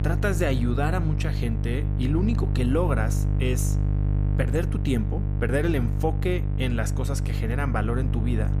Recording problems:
electrical hum; loud; throughout; 50 Hz, 8 dB below the speech

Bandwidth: 15 kHz